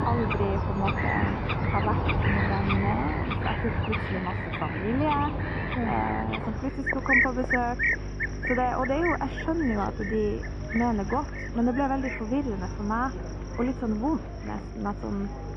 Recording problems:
muffled; very; fading above 1.5 kHz
garbled, watery; slightly; nothing above 10 kHz
animal sounds; very loud; throughout; 1 dB above the speech
electrical hum; noticeable; throughout; 50 Hz, 20 dB below the speech
murmuring crowd; noticeable; throughout; 15 dB below the speech

